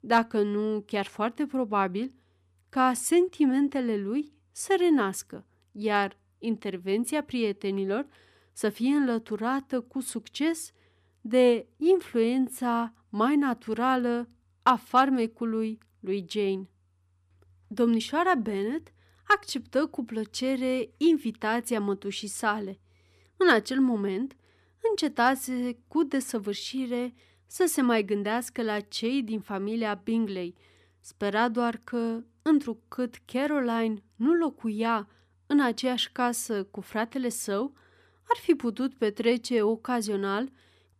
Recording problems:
none

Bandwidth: 14.5 kHz